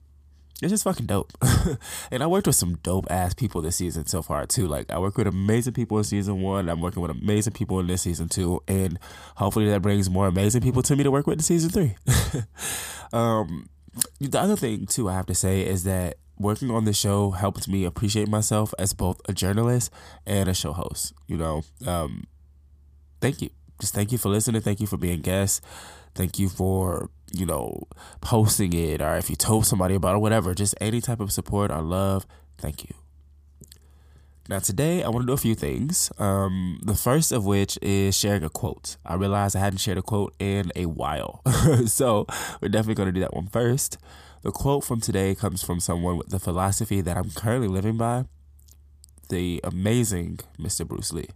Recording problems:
none

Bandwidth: 15 kHz